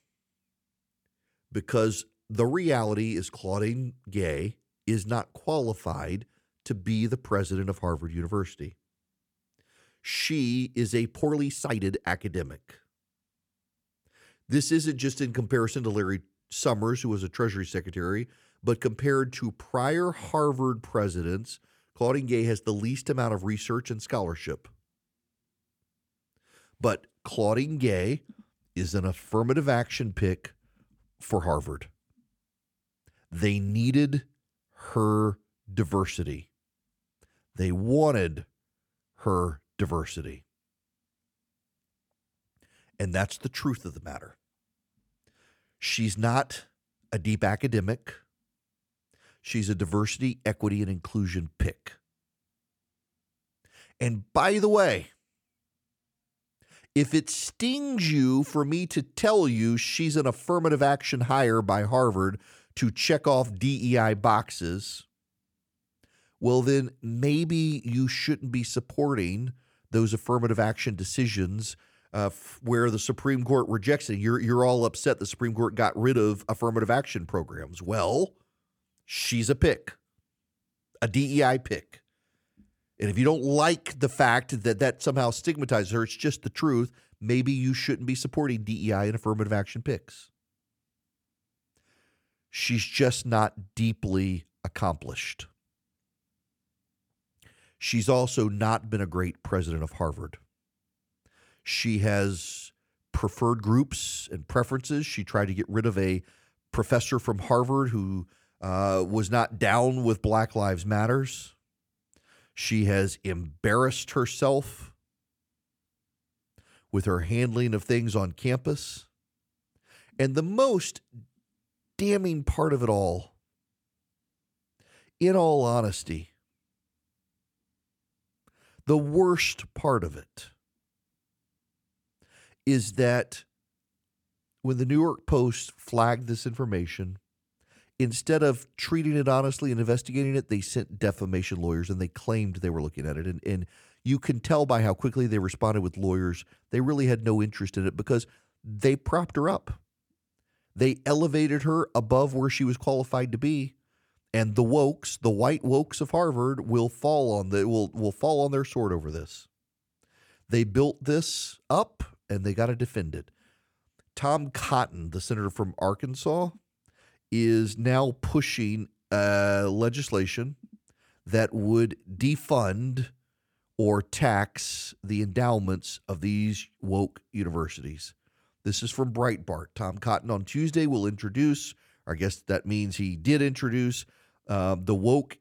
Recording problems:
uneven, jittery; strongly; from 5.5 s to 2:21

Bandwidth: 18 kHz